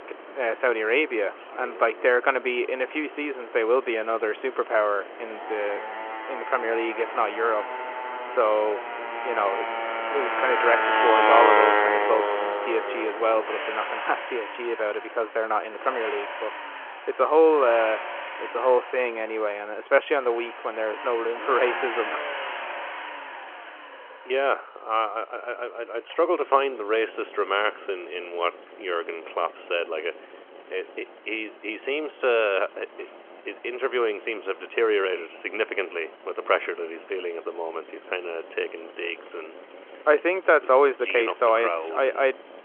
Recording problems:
phone-call audio
traffic noise; loud; throughout; 2 dB below the speech

